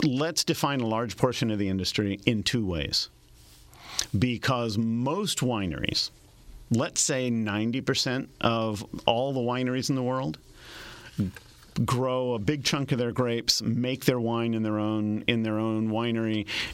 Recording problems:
squashed, flat; somewhat

